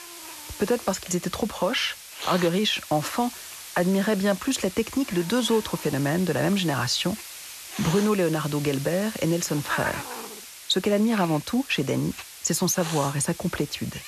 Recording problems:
hiss; noticeable; throughout; 10 dB below the speech

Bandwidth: 13.5 kHz